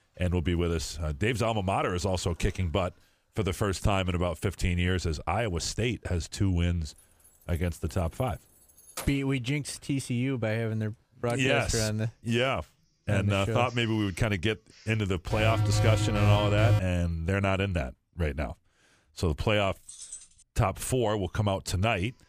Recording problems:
household noises; faint; throughout; 30 dB below the speech
jangling keys; faint; from 7.5 to 9 s and at 20 s; peak 10 dB below the speech
alarm; loud; from 15 to 17 s; peak 4 dB above the speech

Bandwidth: 15 kHz